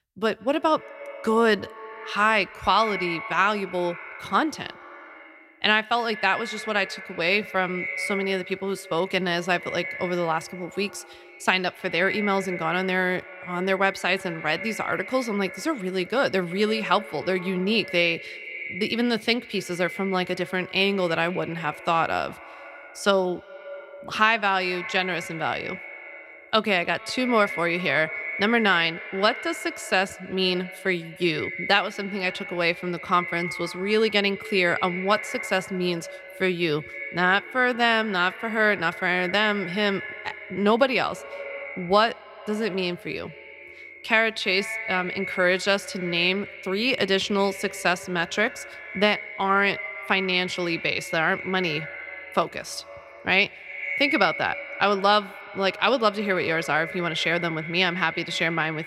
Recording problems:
echo of what is said; strong; throughout; 130 ms later, 10 dB below the speech

